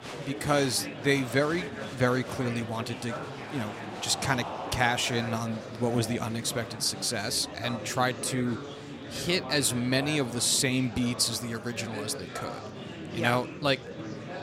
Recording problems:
murmuring crowd; loud; throughout; 10 dB below the speech

